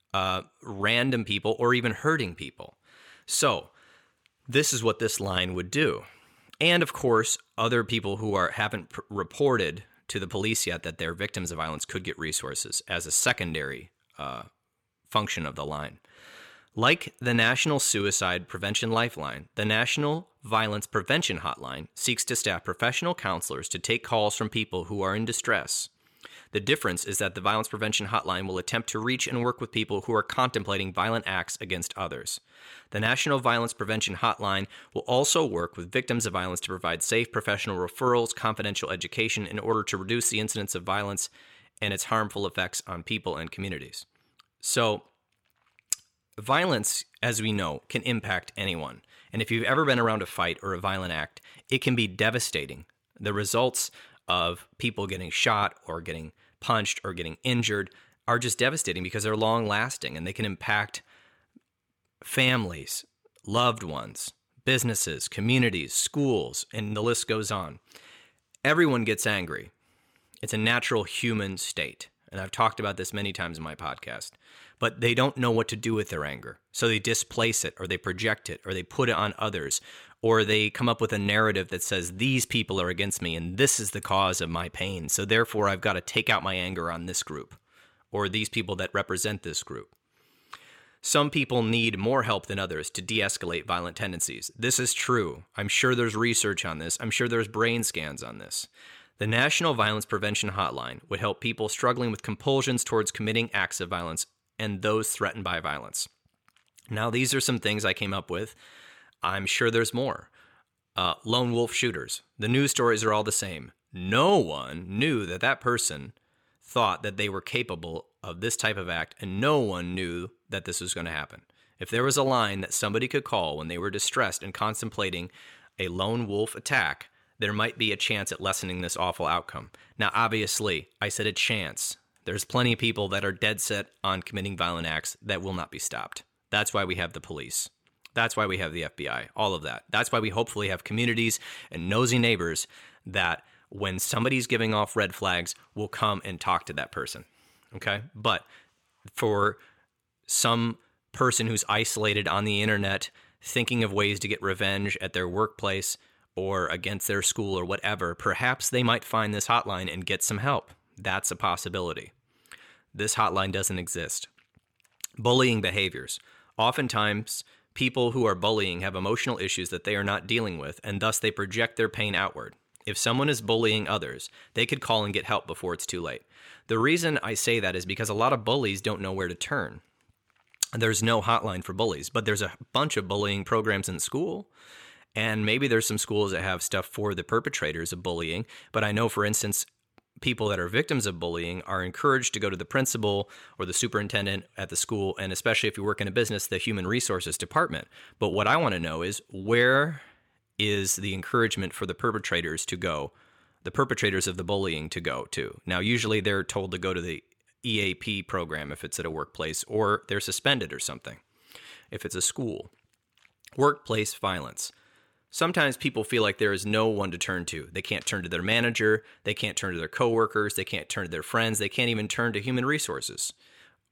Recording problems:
none

